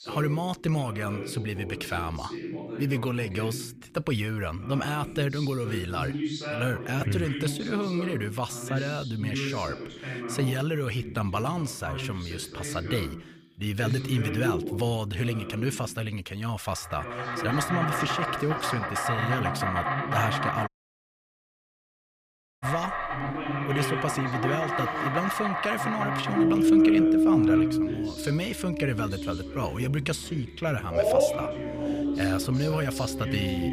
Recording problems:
animal sounds; very loud; from 17 s on; 3 dB above the speech
voice in the background; loud; throughout; 6 dB below the speech
audio cutting out; at 21 s for 2 s

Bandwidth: 15 kHz